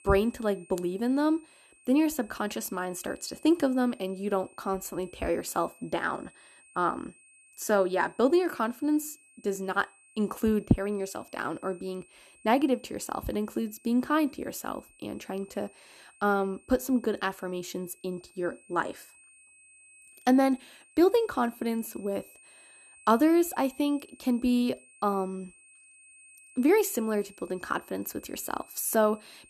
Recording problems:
high-pitched whine; faint; throughout; 2.5 kHz, 25 dB below the speech

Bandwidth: 13.5 kHz